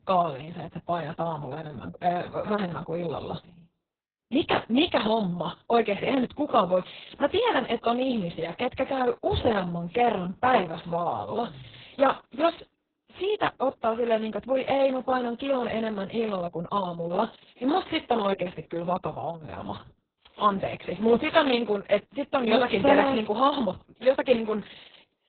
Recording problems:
garbled, watery; badly; nothing above 4 kHz

